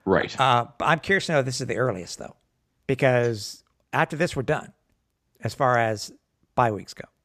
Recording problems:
none

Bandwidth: 14.5 kHz